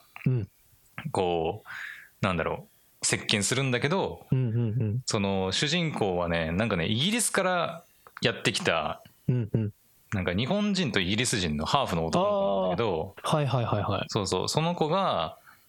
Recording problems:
squashed, flat; heavily

